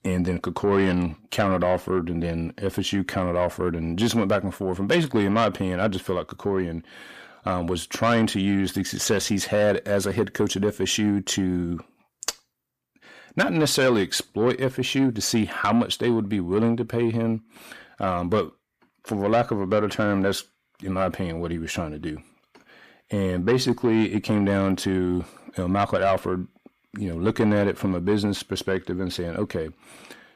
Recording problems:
distortion; slight; 10 dB below the speech

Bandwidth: 14.5 kHz